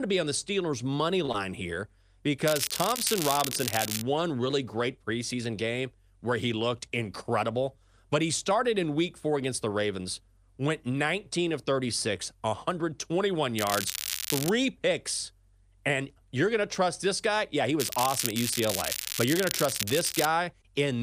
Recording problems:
crackling; loud; from 2.5 to 4 s, at 14 s and from 18 to 20 s; 2 dB below the speech
abrupt cut into speech; at the start and the end

